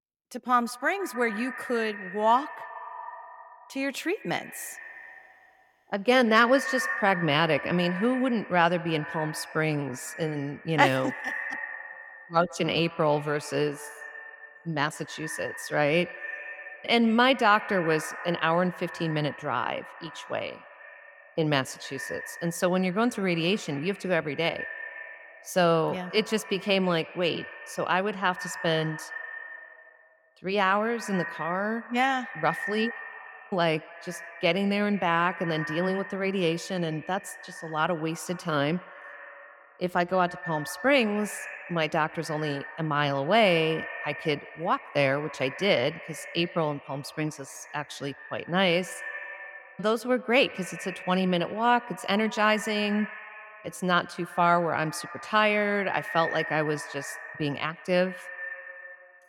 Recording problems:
echo of what is said; noticeable; throughout; 140 ms later, 10 dB below the speech

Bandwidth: 17.5 kHz